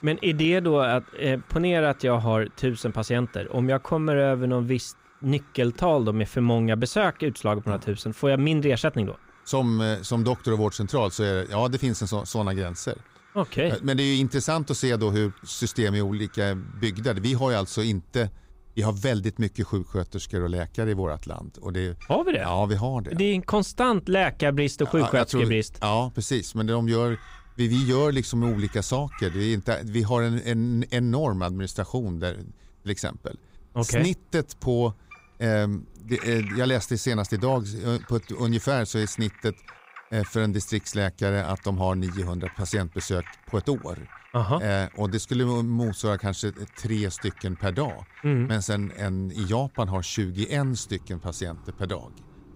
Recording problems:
animal sounds; faint; throughout; 25 dB below the speech

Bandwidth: 15.5 kHz